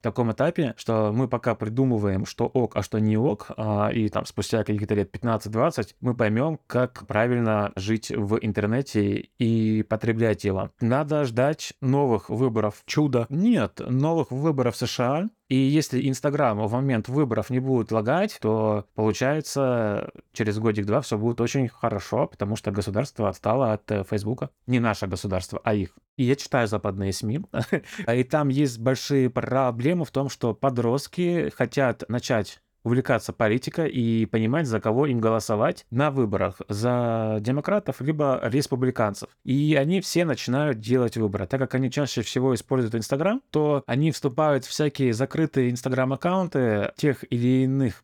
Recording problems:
none

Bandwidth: 18.5 kHz